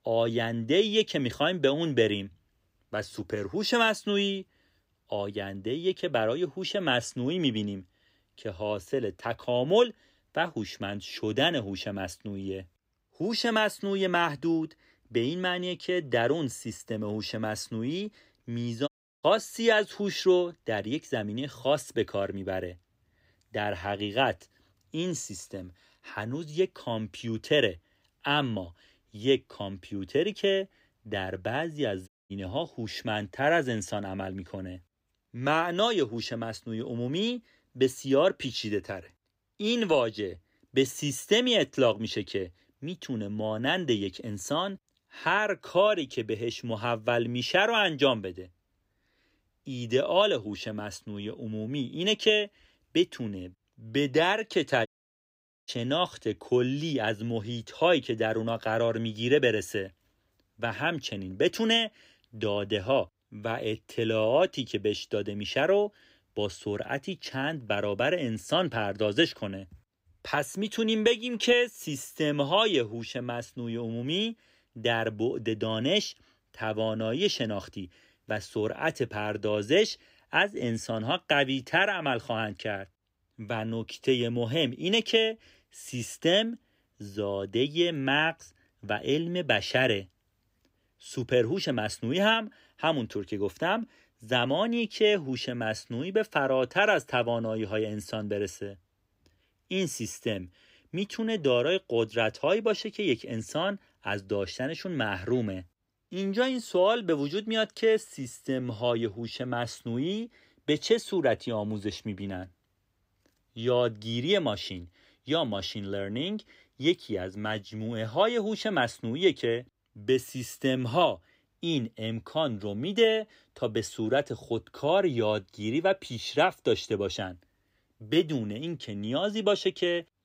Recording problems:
audio cutting out; at 19 s, at 32 s and at 55 s for 1 s

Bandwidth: 15.5 kHz